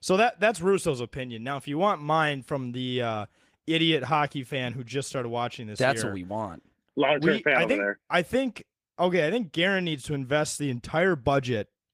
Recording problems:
garbled, watery; slightly; nothing above 15 kHz

